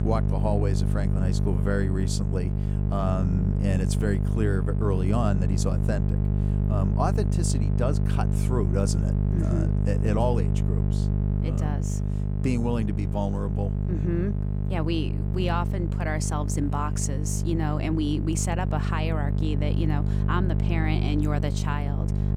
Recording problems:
electrical hum; loud; throughout; 50 Hz, 5 dB below the speech

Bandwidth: 18.5 kHz